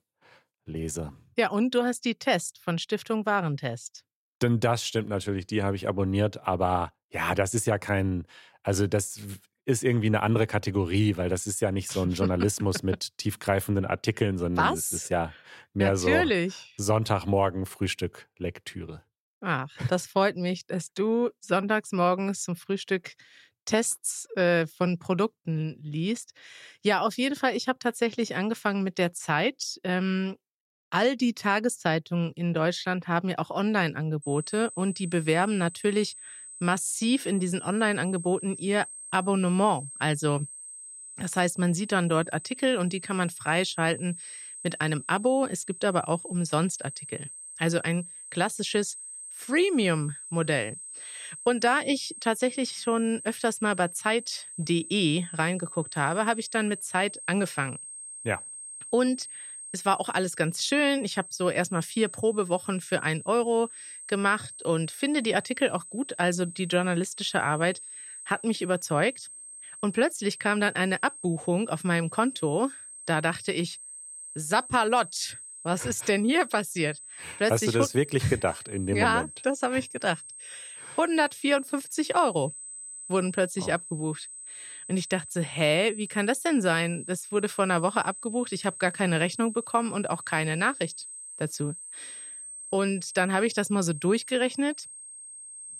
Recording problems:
high-pitched whine; noticeable; from 34 s on; 8 kHz, 10 dB below the speech

